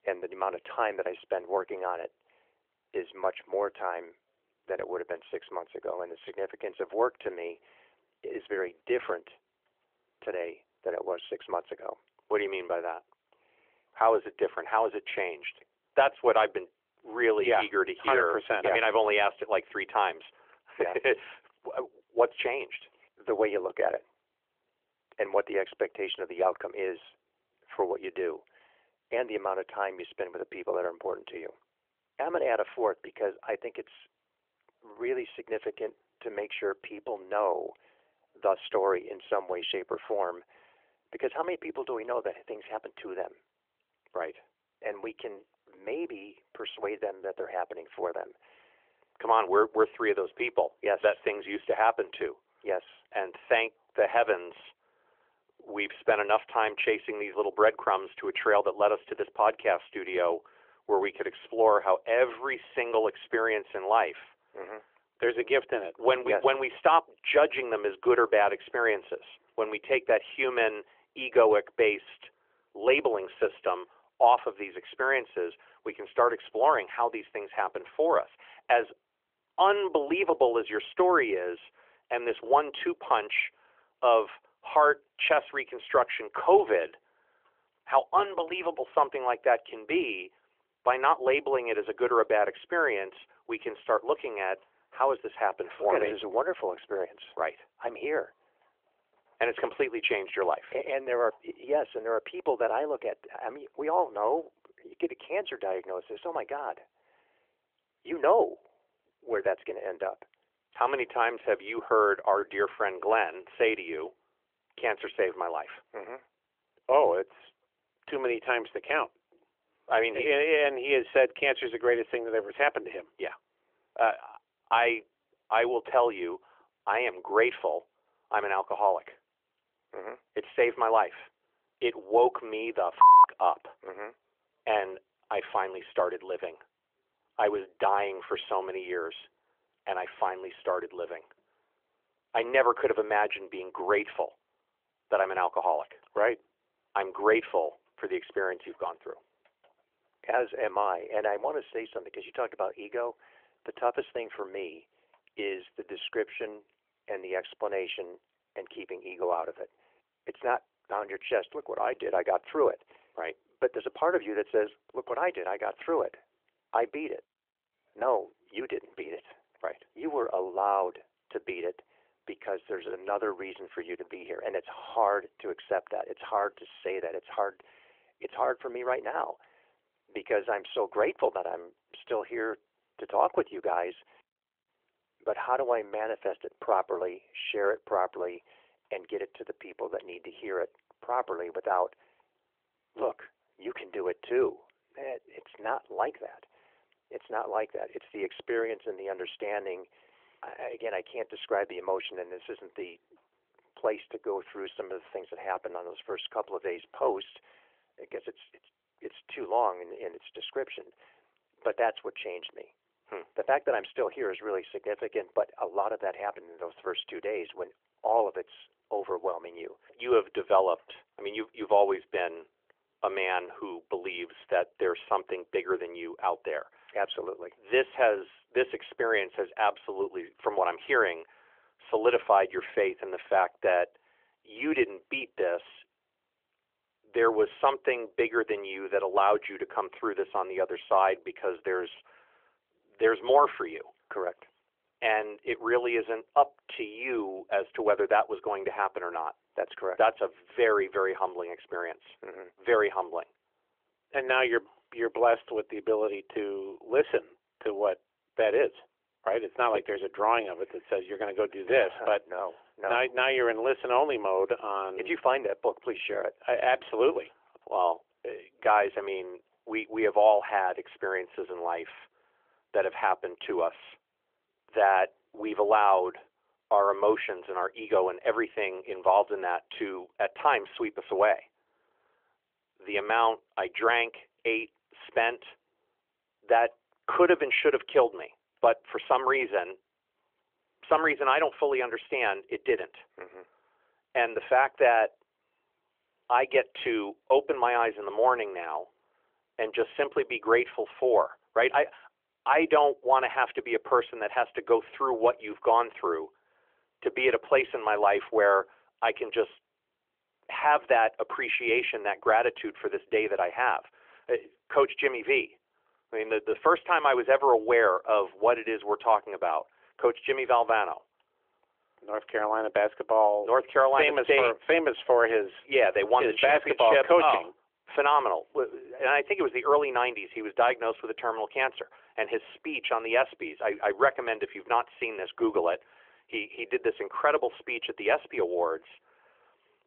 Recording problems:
phone-call audio; nothing above 3.5 kHz

